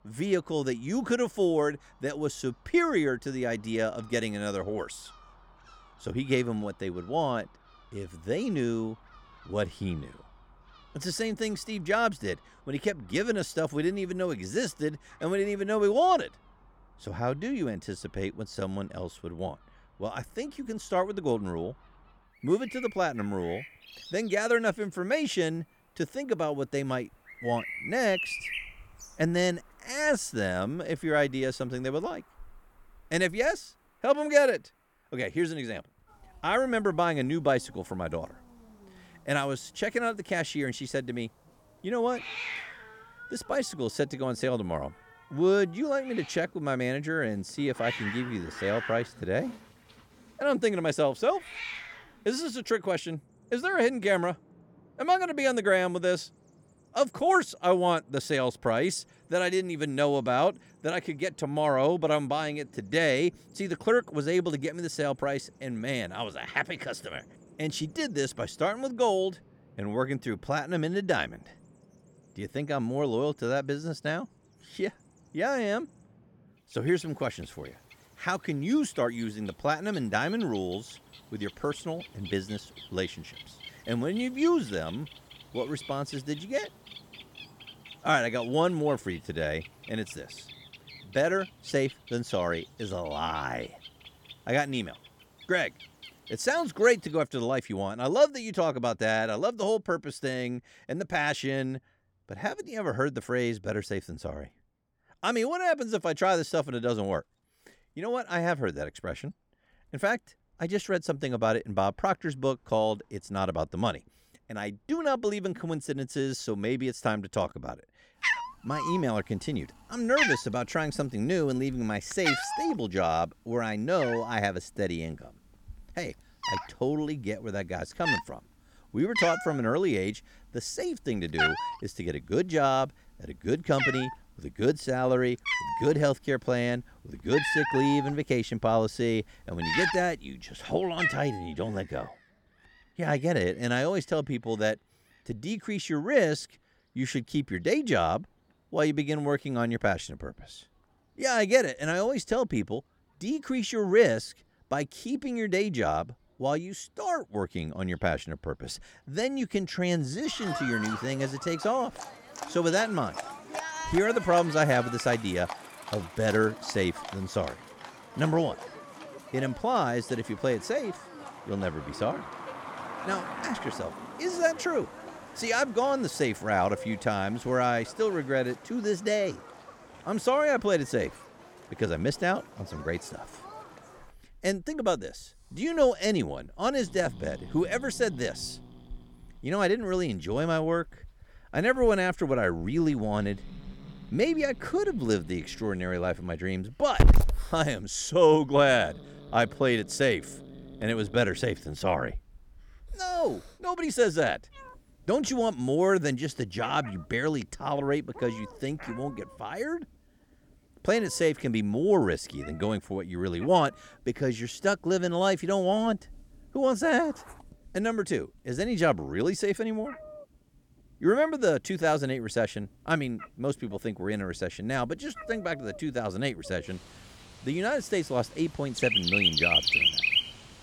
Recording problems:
animal sounds; loud; throughout; 6 dB below the speech

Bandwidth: 18 kHz